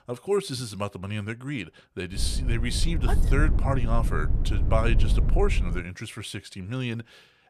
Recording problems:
low rumble; noticeable; from 2 to 6 s; 10 dB below the speech

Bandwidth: 14.5 kHz